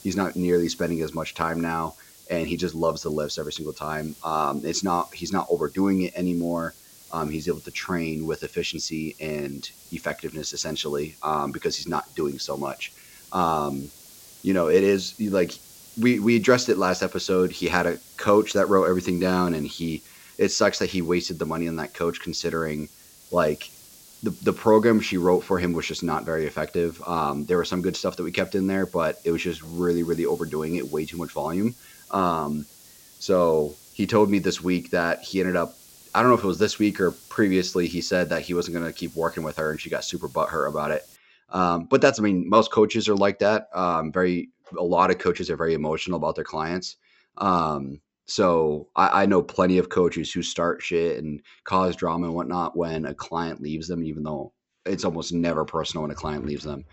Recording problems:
high frequencies cut off; noticeable; nothing above 8 kHz
hiss; faint; until 41 s; 20 dB below the speech

